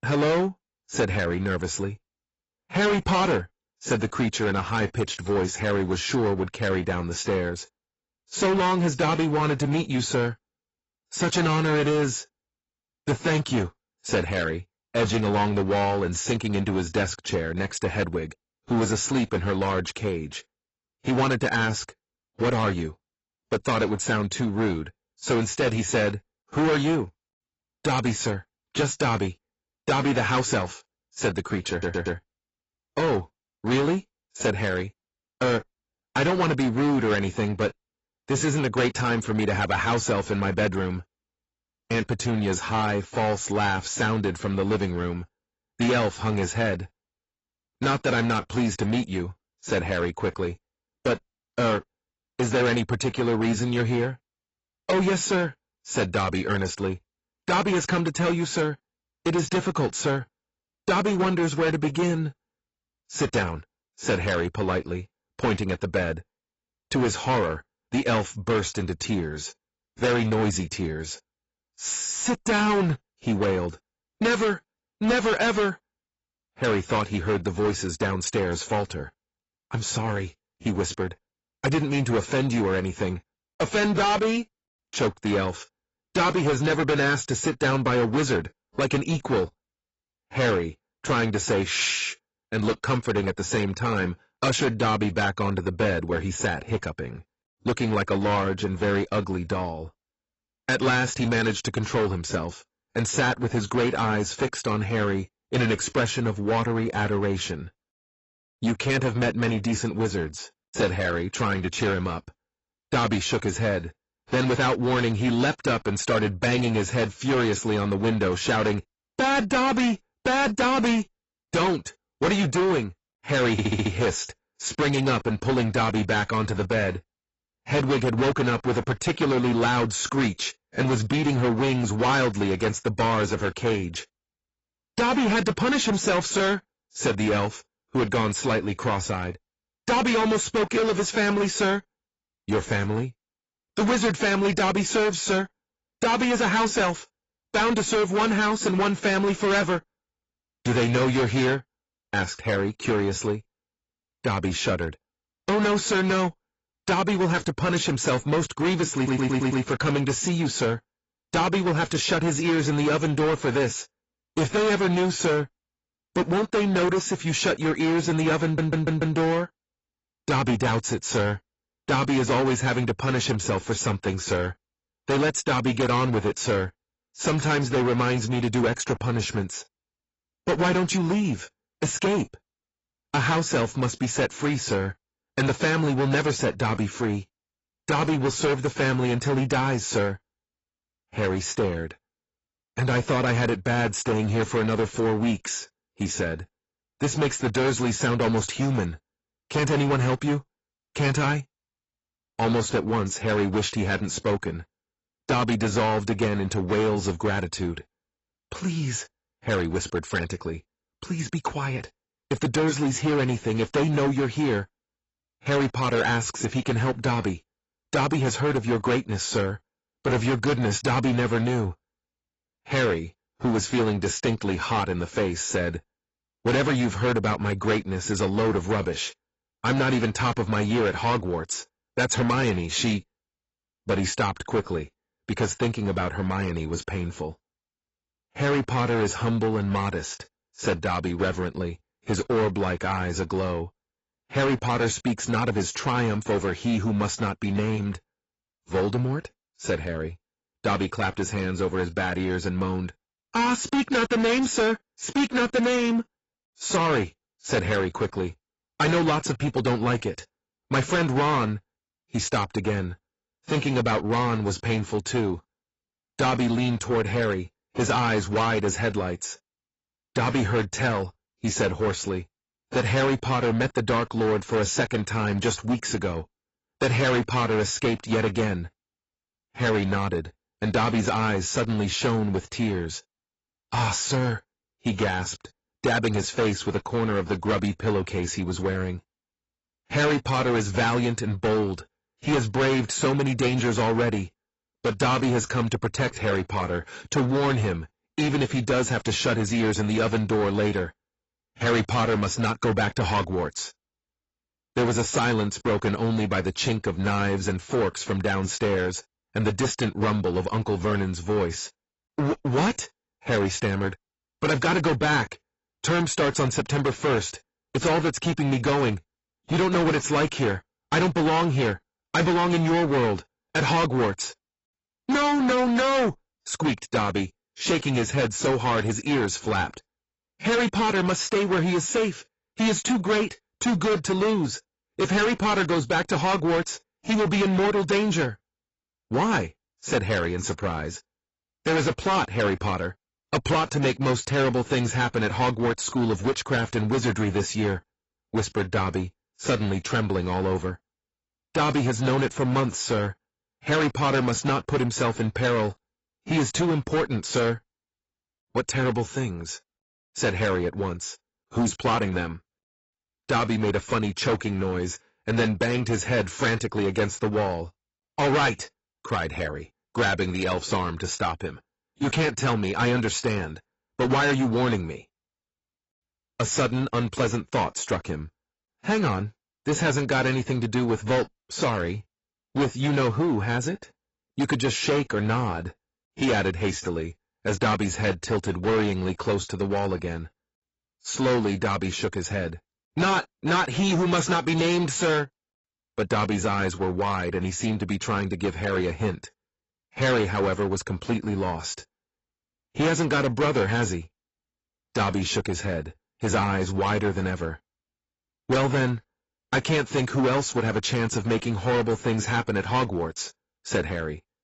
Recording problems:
distortion; heavy; 14% of the sound clipped
garbled, watery; badly; nothing above 7.5 kHz
audio stuttering; 4 times, first at 32 s

